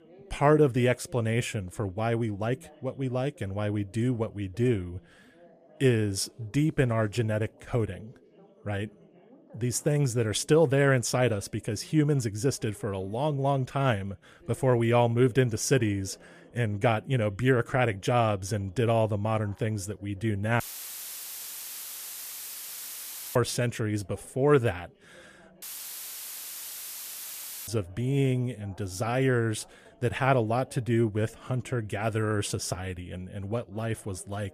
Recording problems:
background chatter; faint; throughout; 2 voices, 30 dB below the speech
audio cutting out; filled with static; at 21 s for 3 s and at 26 s for 2 s

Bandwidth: 14.5 kHz